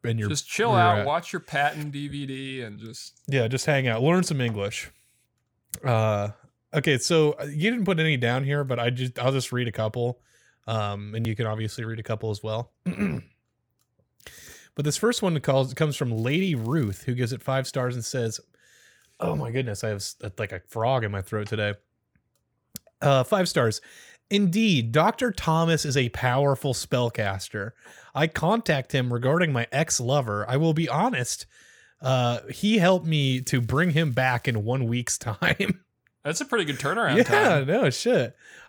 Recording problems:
crackling; faint; at 16 s and from 33 to 35 s; 30 dB below the speech

